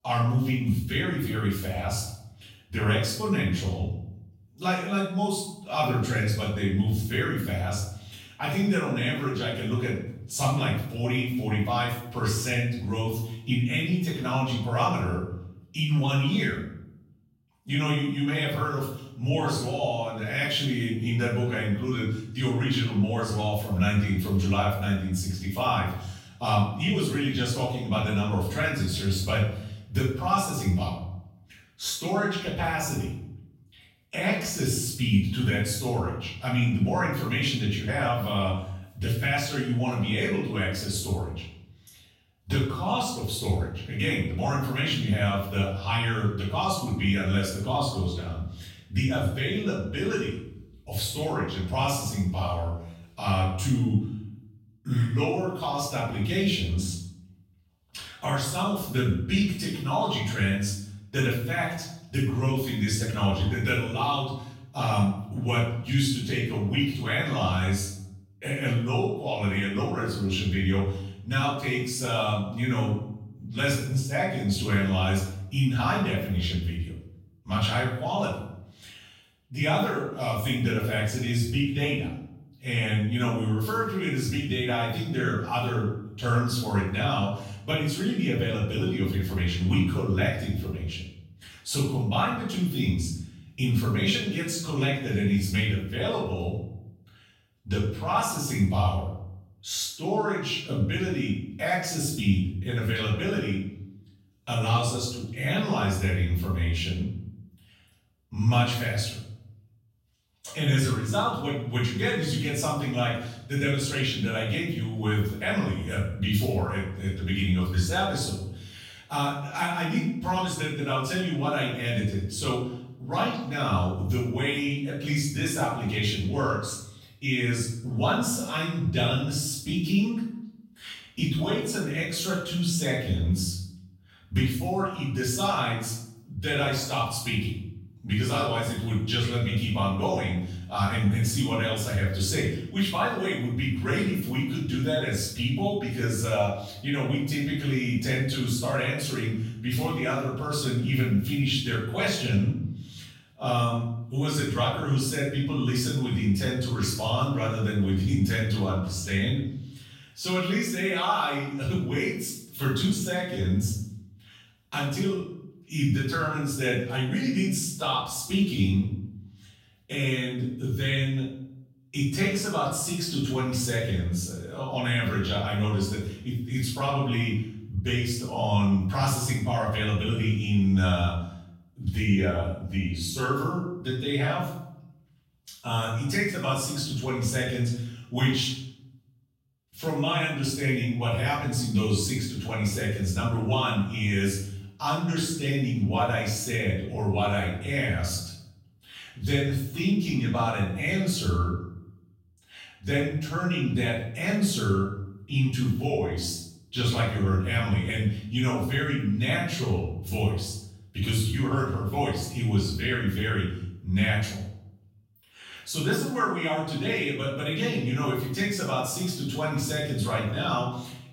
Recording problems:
off-mic speech; far
room echo; noticeable; dies away in 0.7 s

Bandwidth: 16 kHz